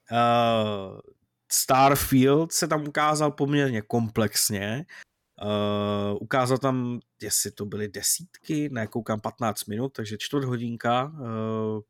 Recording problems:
audio cutting out; at 5 s

